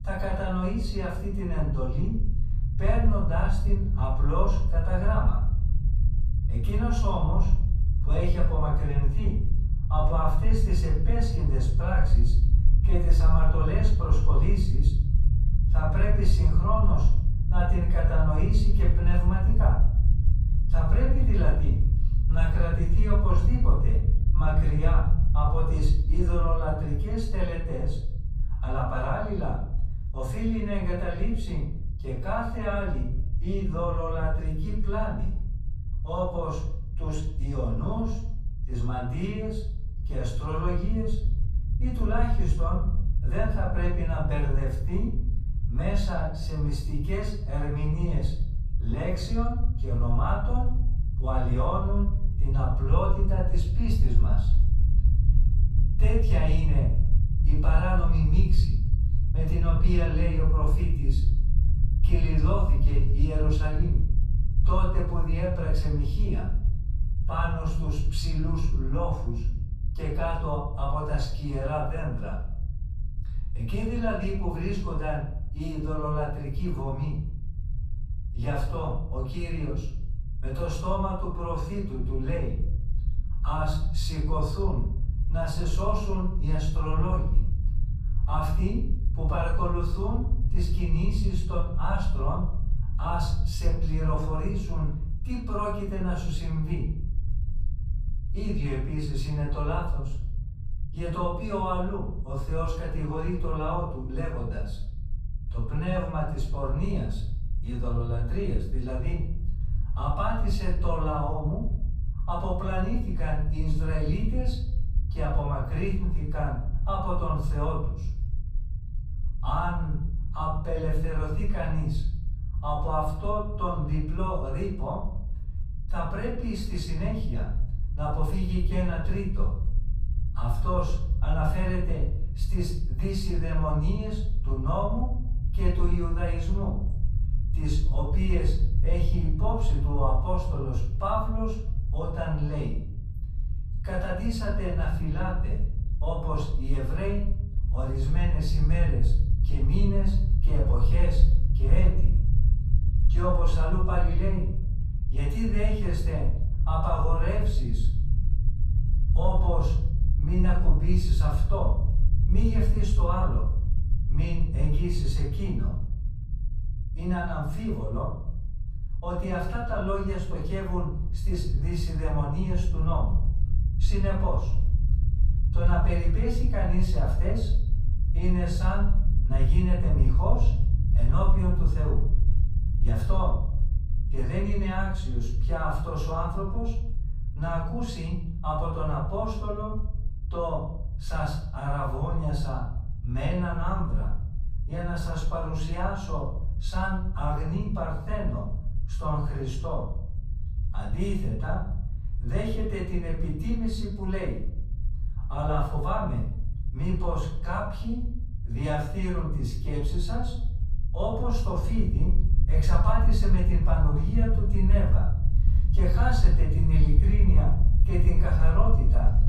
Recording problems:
off-mic speech; far
room echo; noticeable; dies away in 0.6 s
low rumble; noticeable; throughout; 15 dB below the speech

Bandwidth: 15 kHz